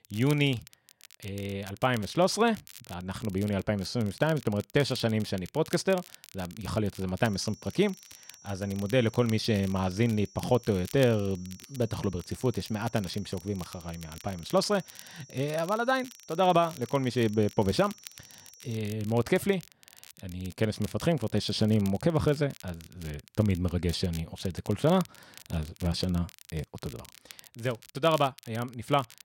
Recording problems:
crackle, like an old record; noticeable; 20 dB below the speech
high-pitched whine; faint; from 7.5 to 19 s; 5.5 kHz, 25 dB below the speech

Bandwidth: 16 kHz